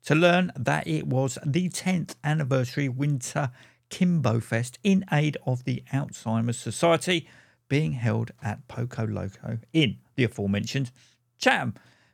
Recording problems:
none

